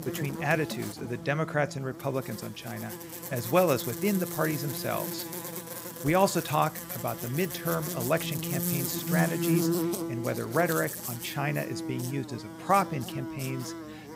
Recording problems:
electrical hum; loud; throughout; 60 Hz, 8 dB below the speech

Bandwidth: 15.5 kHz